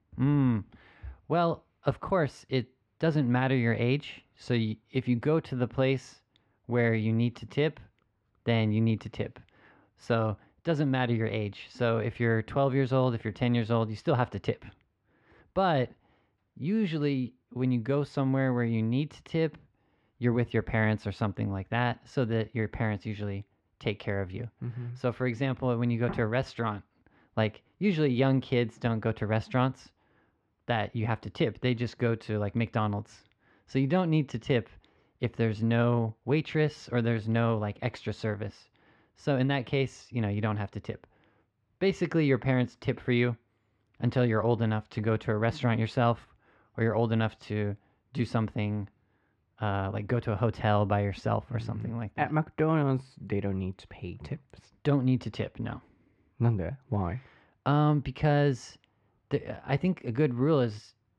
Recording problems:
muffled; very; fading above 2 kHz

